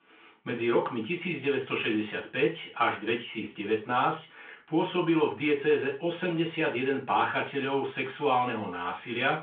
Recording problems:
off-mic speech; far
room echo; slight; dies away in 0.3 s
phone-call audio; nothing above 3.5 kHz

